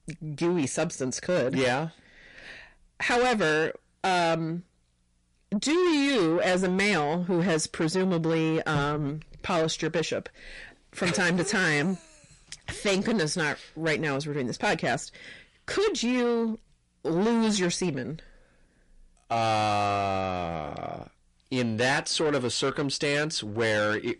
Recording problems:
distortion; heavy; 7 dB below the speech
garbled, watery; slightly; nothing above 10.5 kHz

